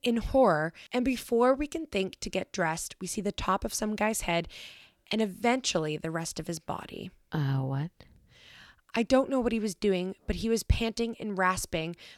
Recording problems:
none

